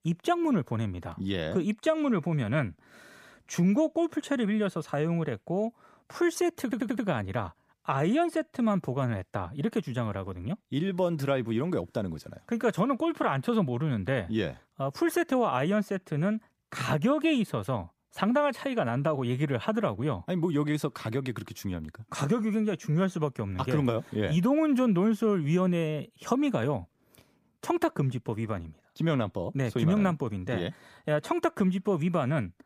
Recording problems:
audio stuttering; at 6.5 s

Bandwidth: 15 kHz